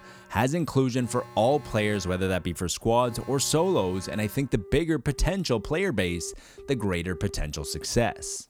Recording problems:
alarms or sirens; noticeable; throughout; 20 dB below the speech

